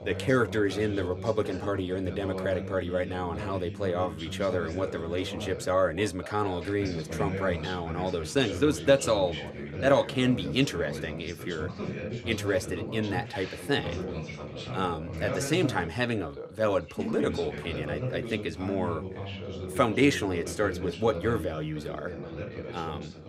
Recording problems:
background chatter; loud; throughout; 2 voices, 8 dB below the speech

